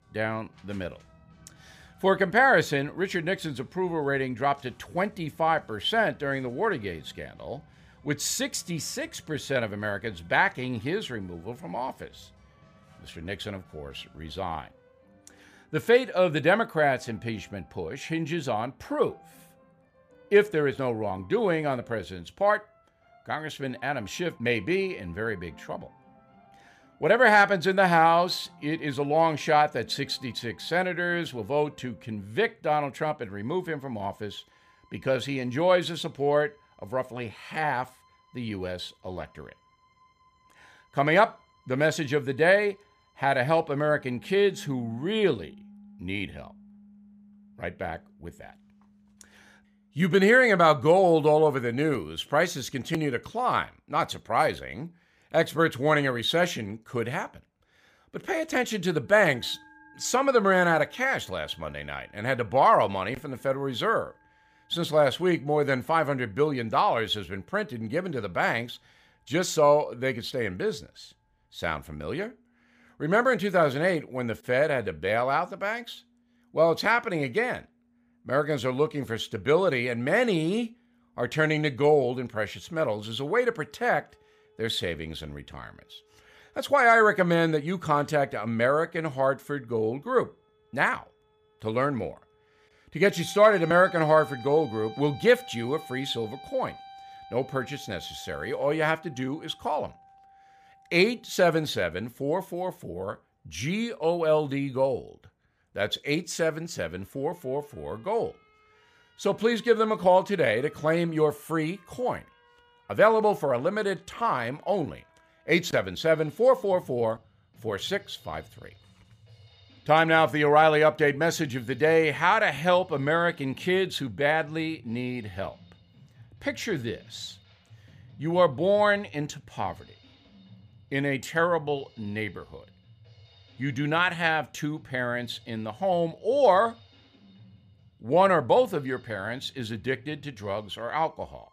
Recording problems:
background music; faint; throughout; 25 dB below the speech

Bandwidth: 15 kHz